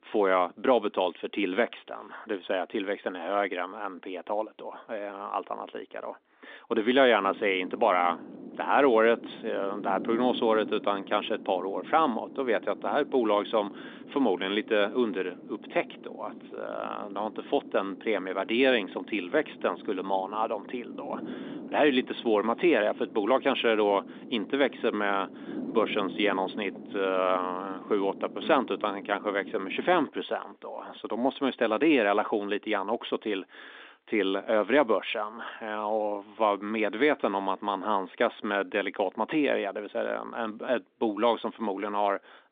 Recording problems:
phone-call audio
wind noise on the microphone; occasional gusts; from 7 to 30 s; 20 dB below the speech

